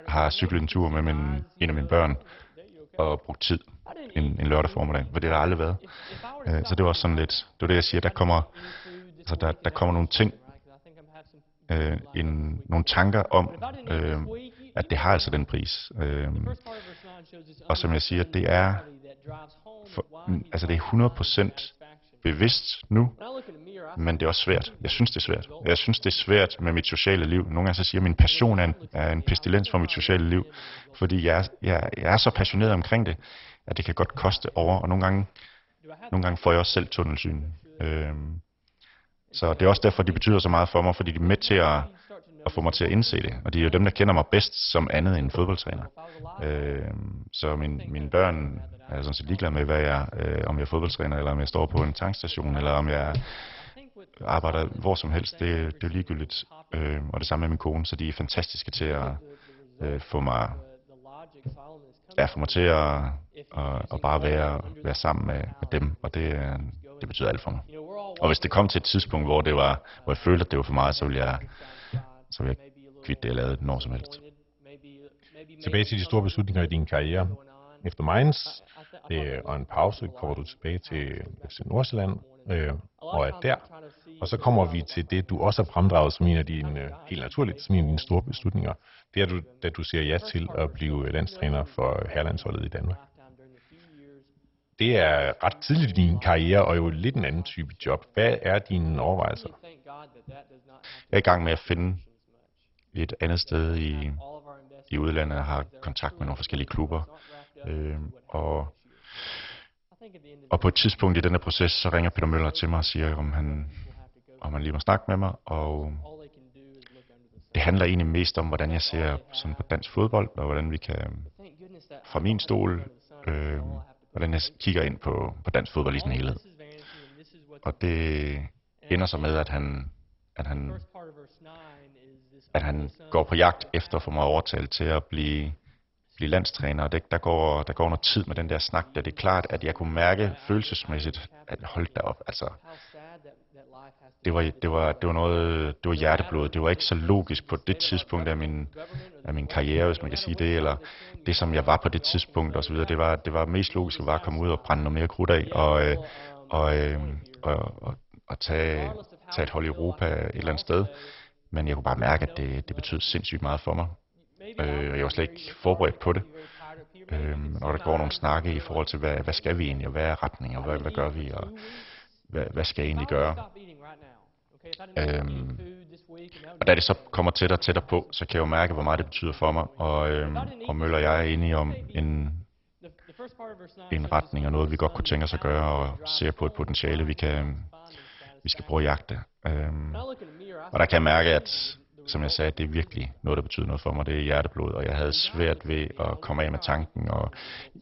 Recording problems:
garbled, watery; badly; nothing above 5.5 kHz
voice in the background; faint; throughout; 20 dB below the speech

